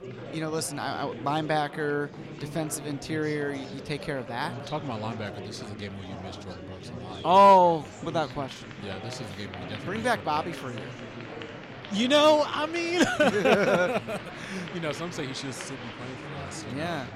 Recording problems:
murmuring crowd; noticeable; throughout; 15 dB below the speech

